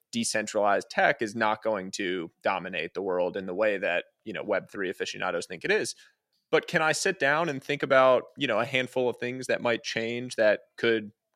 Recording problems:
none

